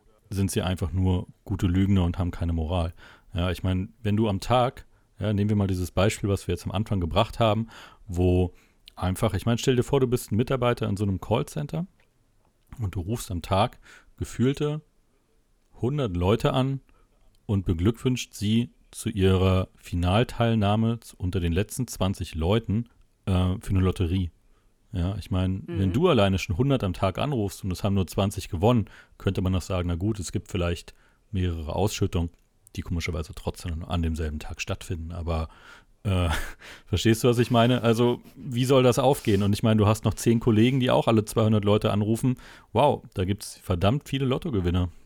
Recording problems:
none

